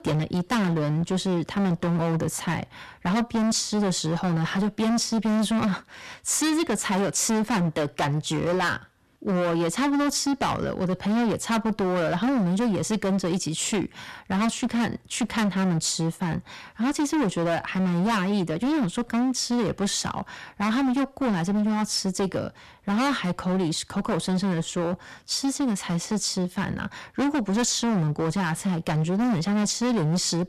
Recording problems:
distortion; heavy; 25% of the sound clipped

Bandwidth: 13.5 kHz